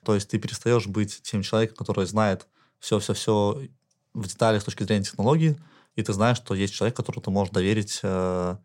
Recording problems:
none

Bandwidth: 16 kHz